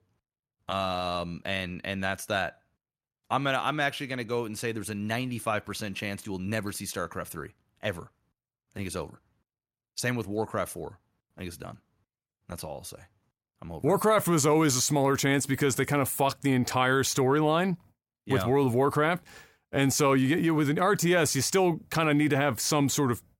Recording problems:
none

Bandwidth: 16.5 kHz